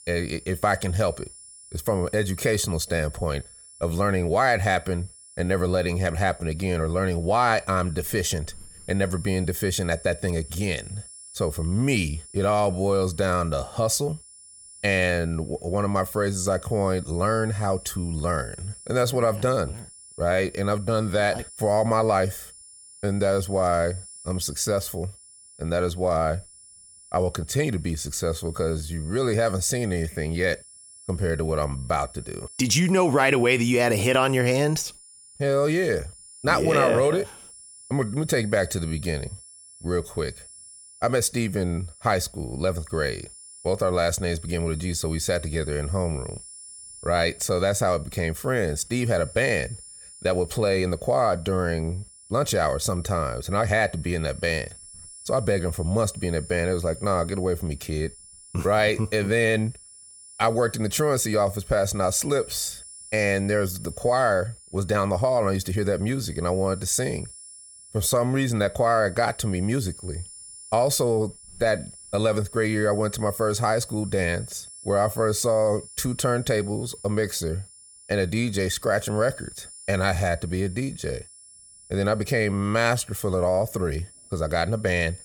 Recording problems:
high-pitched whine; noticeable; throughout; 9.5 kHz, 20 dB below the speech

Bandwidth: 18.5 kHz